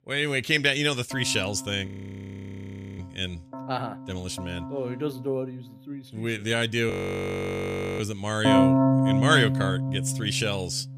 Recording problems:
background music; very loud; throughout; 2 dB above the speech
audio freezing; at 2 s for 1 s and at 7 s for 1 s

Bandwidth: 14.5 kHz